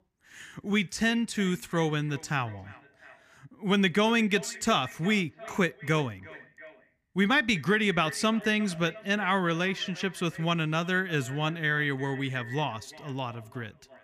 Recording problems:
echo of what is said; noticeable; throughout; 350 ms later, 15 dB below the speech

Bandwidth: 15 kHz